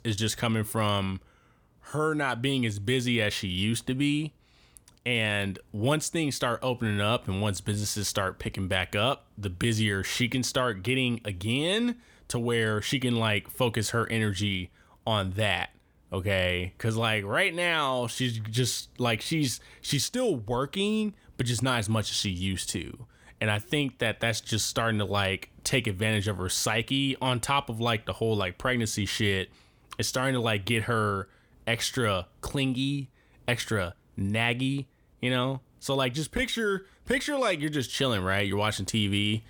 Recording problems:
none

